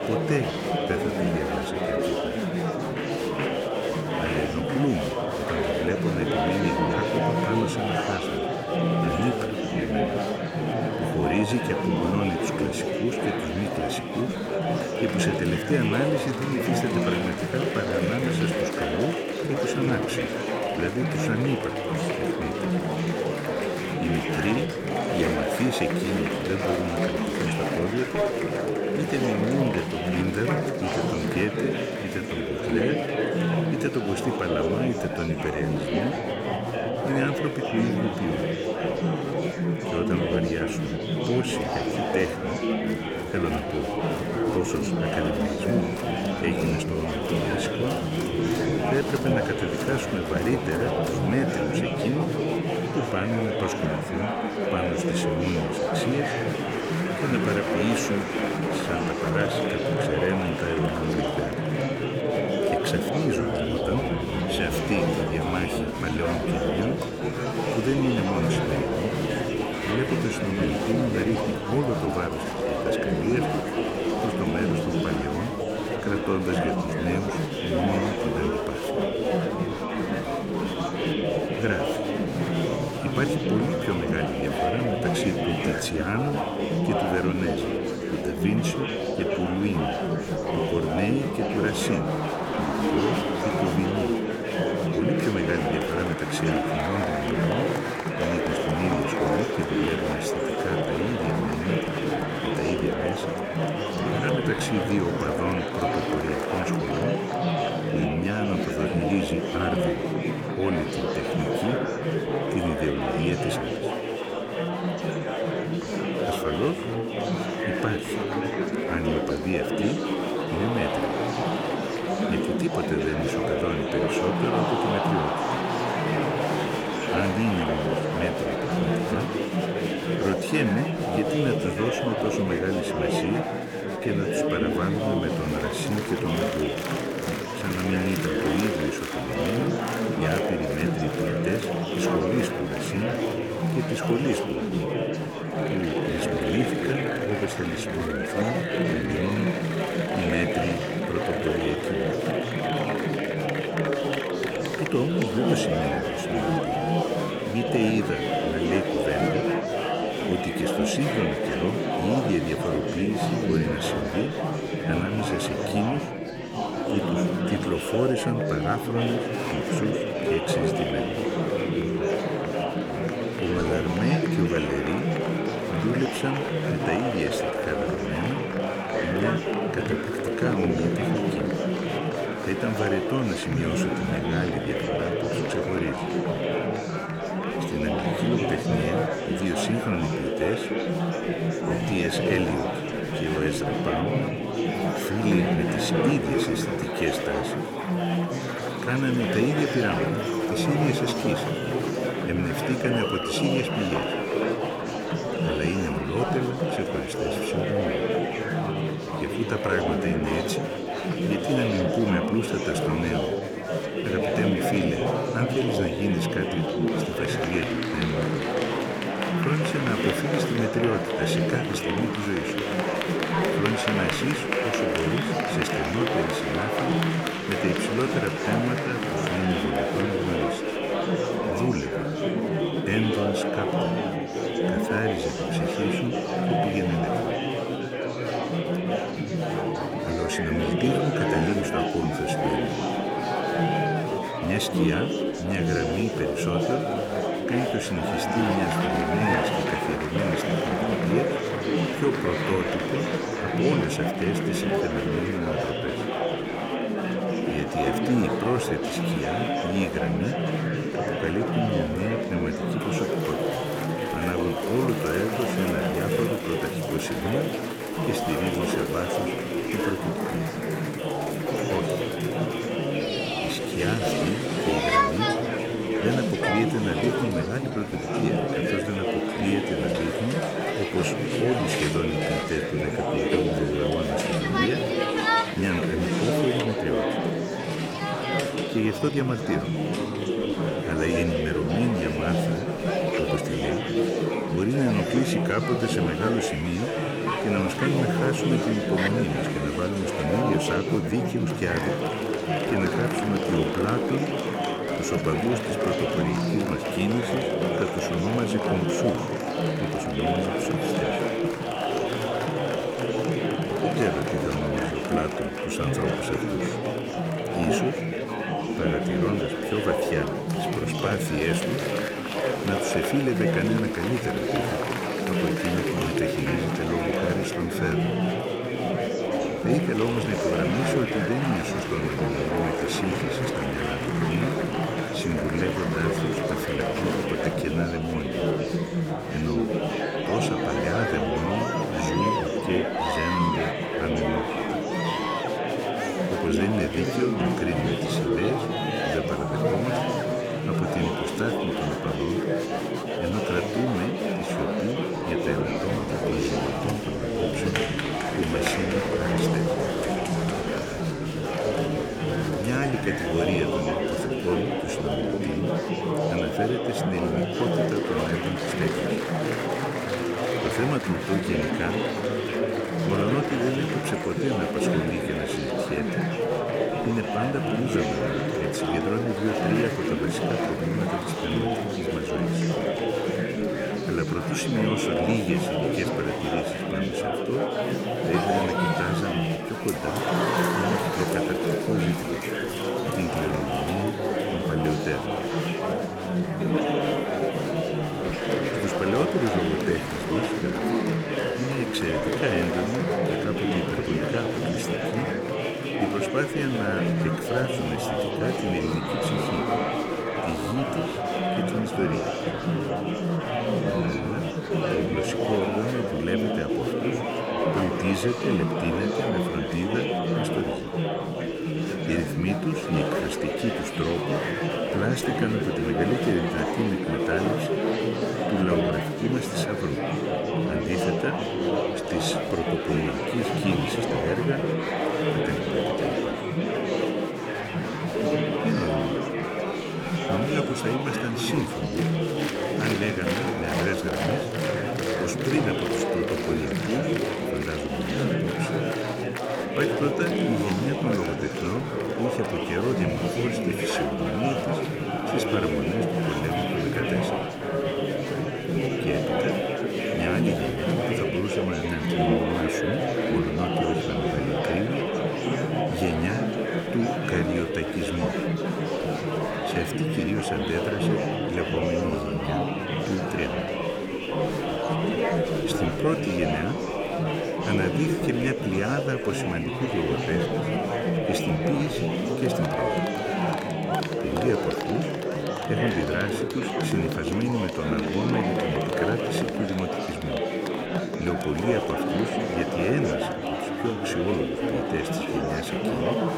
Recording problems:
murmuring crowd; very loud; throughout; 3 dB above the speech

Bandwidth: 18.5 kHz